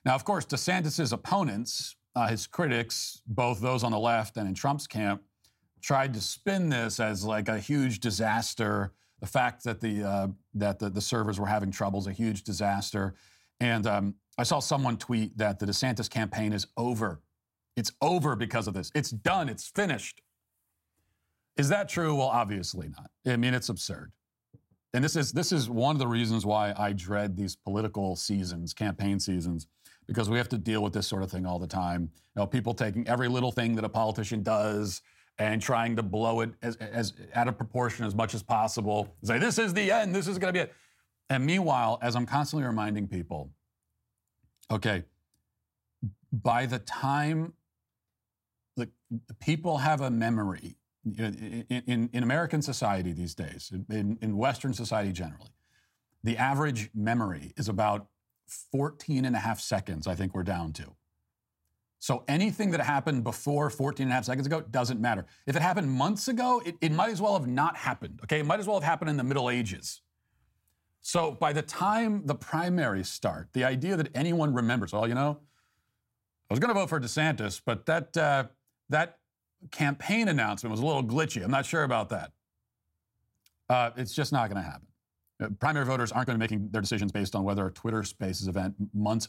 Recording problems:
uneven, jittery; strongly; from 2 s to 1:28

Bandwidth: 16 kHz